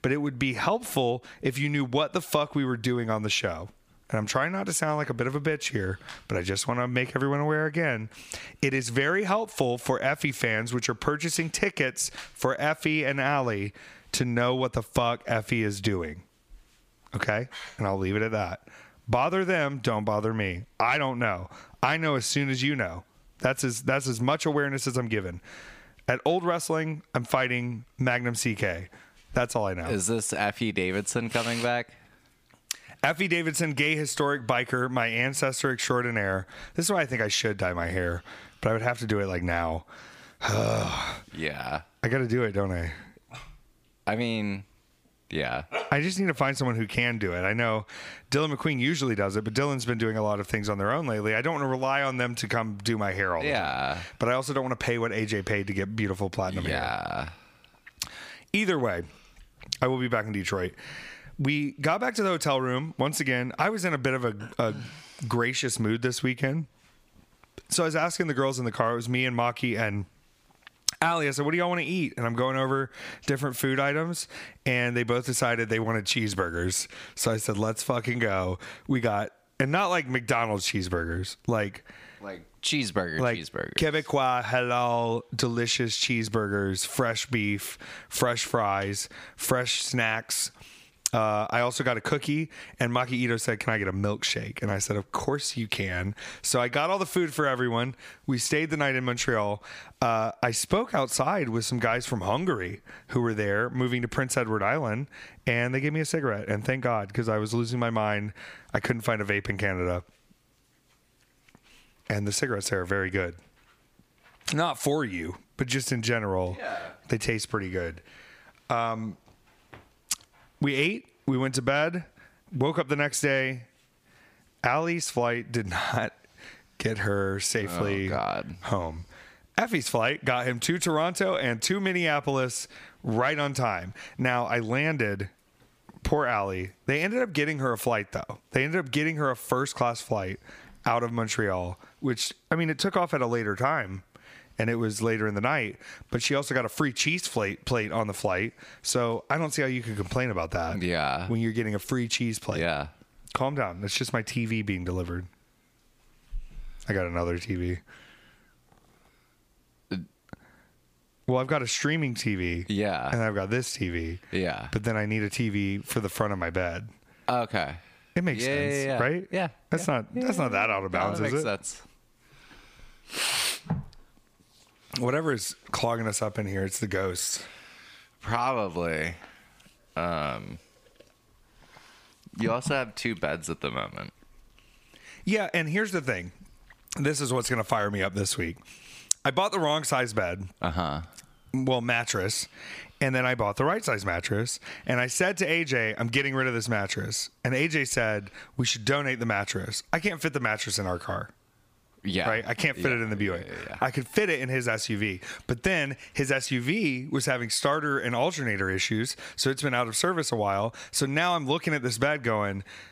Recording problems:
squashed, flat; somewhat

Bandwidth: 15 kHz